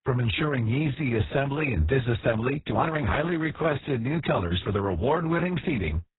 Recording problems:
garbled, watery; badly
high frequencies cut off; severe; nothing above 4 kHz
uneven, jittery; strongly; from 1 to 5.5 s

